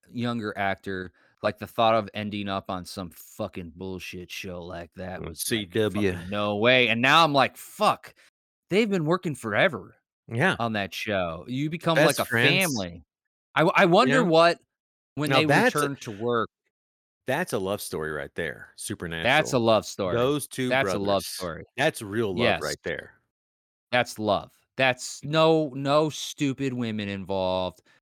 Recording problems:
none

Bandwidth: 19 kHz